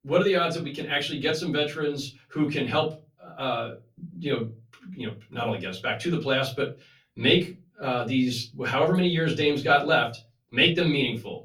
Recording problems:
off-mic speech; far
room echo; very slight; dies away in 0.3 s

